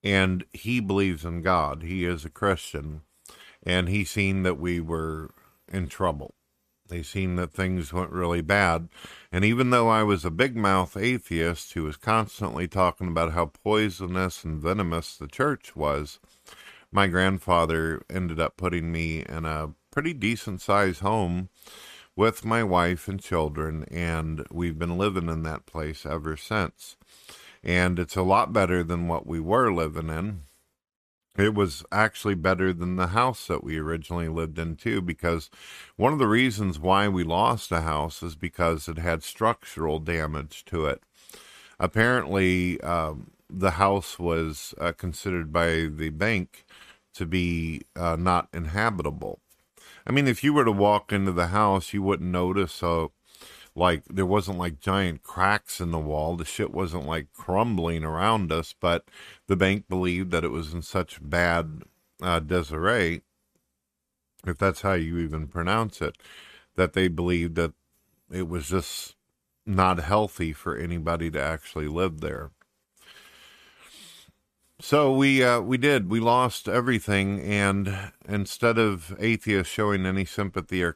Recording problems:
none

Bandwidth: 14.5 kHz